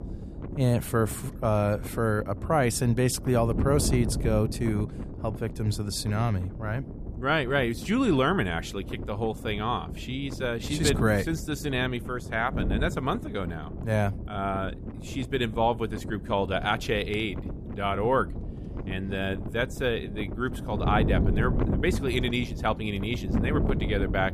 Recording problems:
wind noise on the microphone; occasional gusts; 10 dB below the speech

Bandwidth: 14.5 kHz